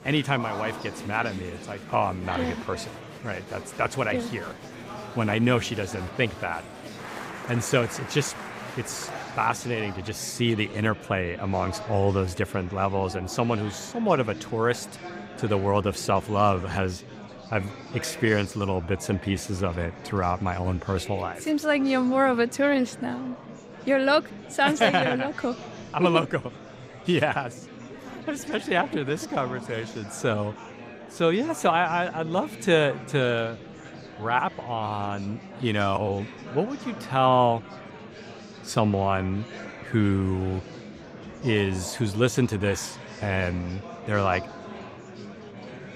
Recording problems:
murmuring crowd; noticeable; throughout; 15 dB below the speech

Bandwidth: 15.5 kHz